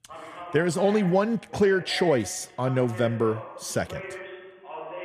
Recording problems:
voice in the background; noticeable; throughout; 15 dB below the speech

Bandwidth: 14.5 kHz